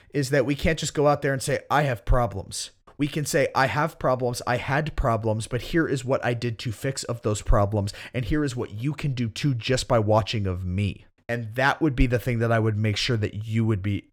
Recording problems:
none

